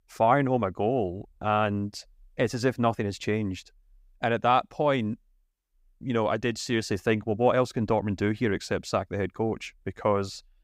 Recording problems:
none

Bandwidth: 15.5 kHz